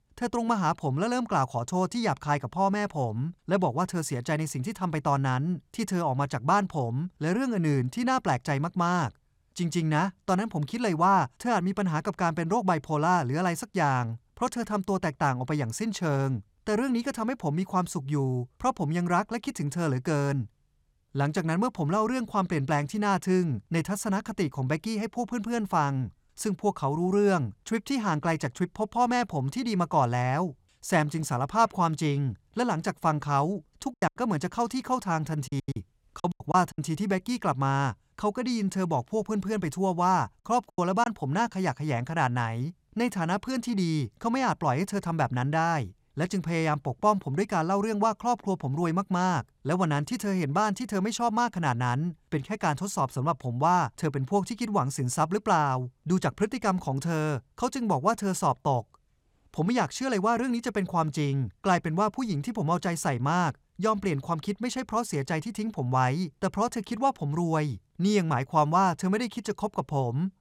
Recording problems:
choppy; very; from 34 to 37 s and at 41 s; 11% of the speech affected

